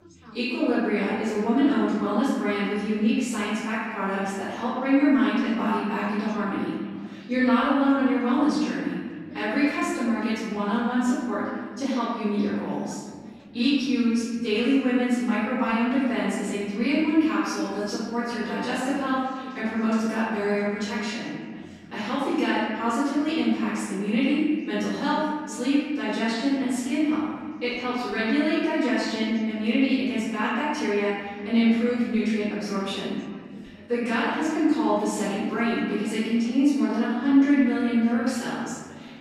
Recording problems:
room echo; strong; dies away in 1.6 s
off-mic speech; far
background chatter; faint; throughout; 4 voices, 20 dB below the speech

